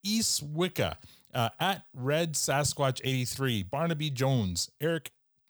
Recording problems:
none

